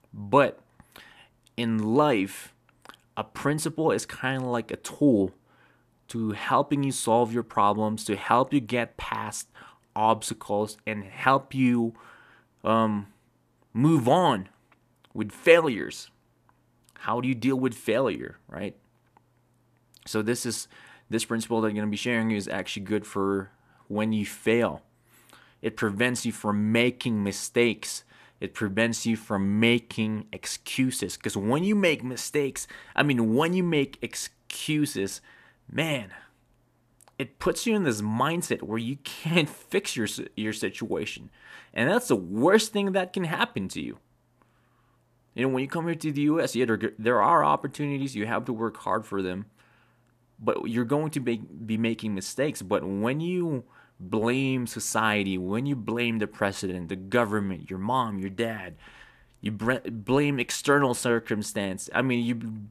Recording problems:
none

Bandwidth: 14.5 kHz